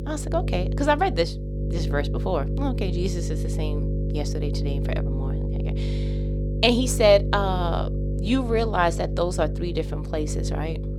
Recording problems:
electrical hum; noticeable; throughout; 50 Hz, 10 dB below the speech

